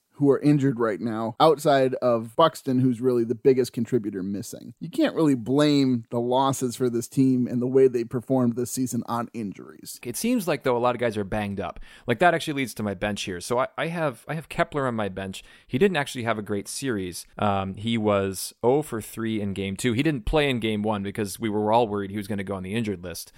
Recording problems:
none

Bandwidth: 16 kHz